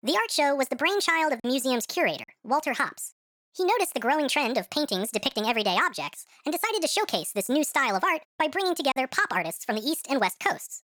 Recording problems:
wrong speed and pitch; too fast and too high; 1.5 times normal speed
choppy; occasionally; 1% of the speech affected

